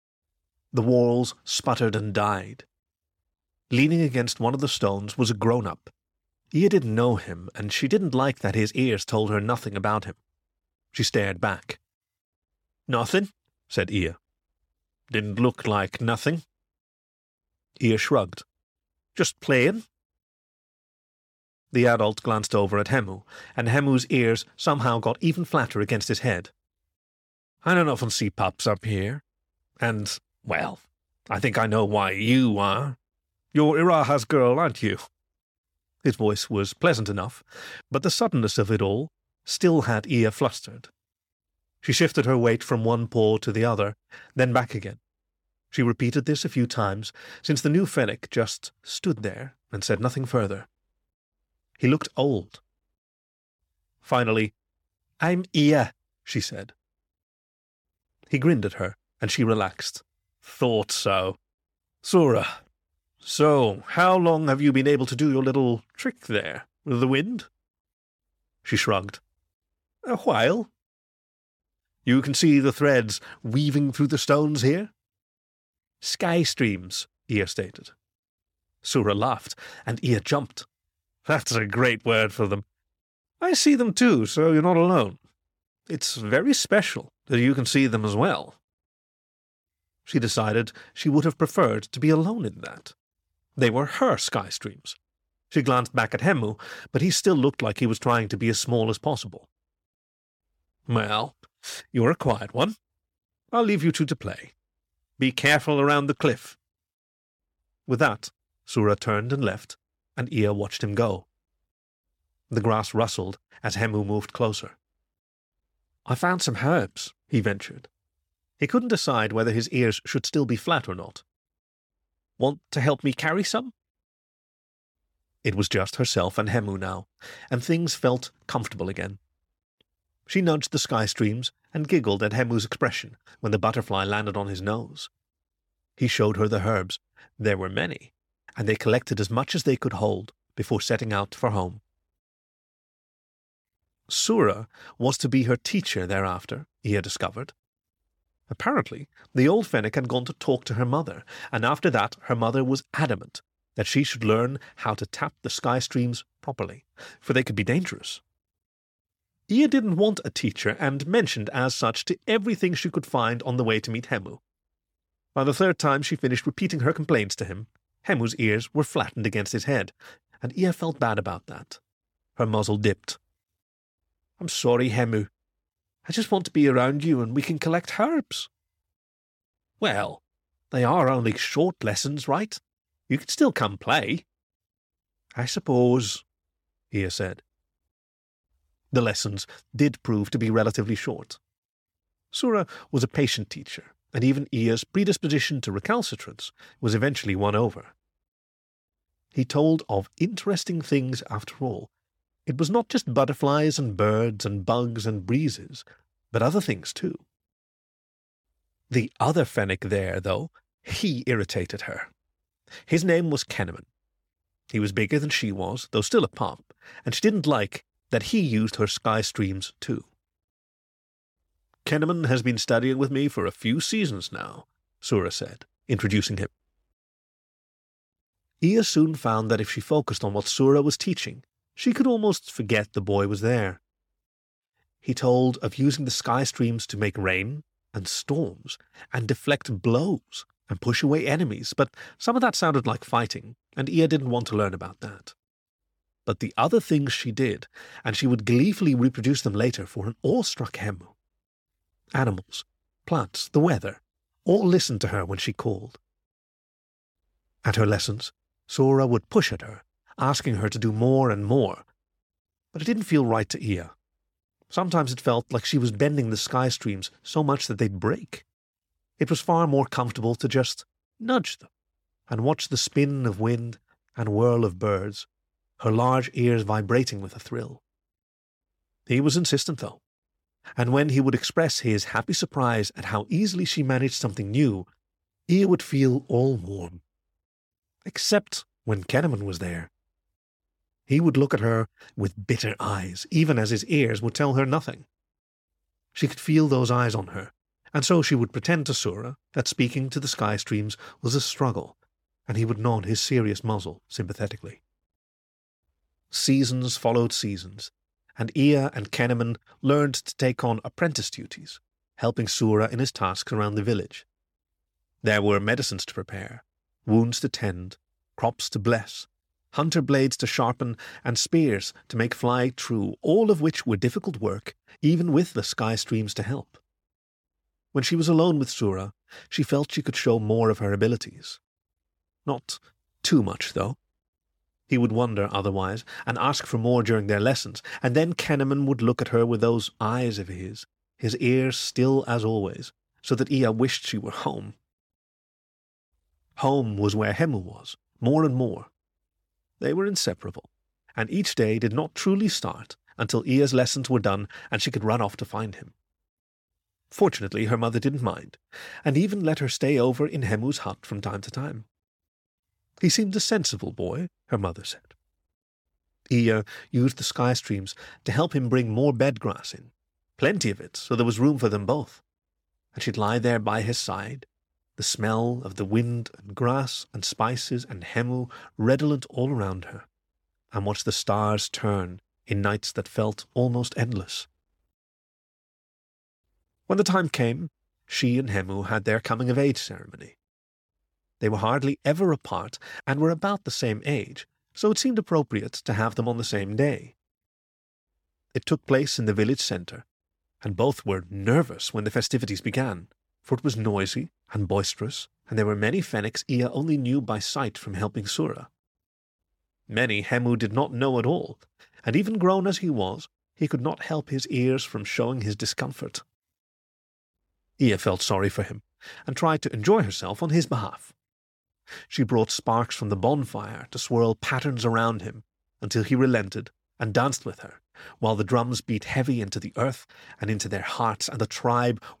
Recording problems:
none

